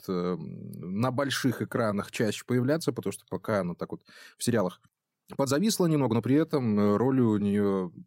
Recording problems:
uneven, jittery; strongly; from 1.5 to 7.5 s

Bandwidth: 16 kHz